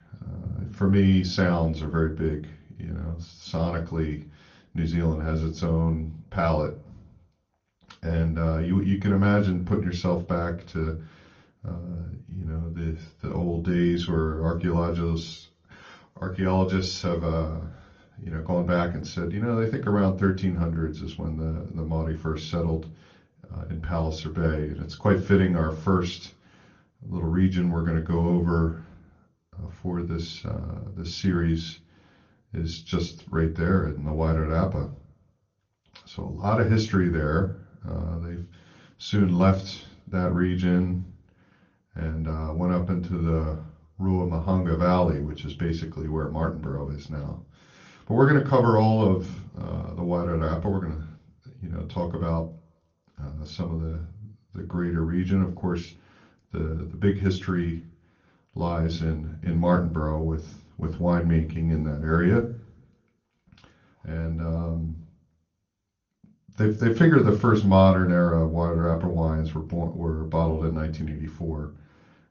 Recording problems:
room echo; very slight; dies away in 0.3 s
off-mic speech; somewhat distant
garbled, watery; slightly; nothing above 6.5 kHz

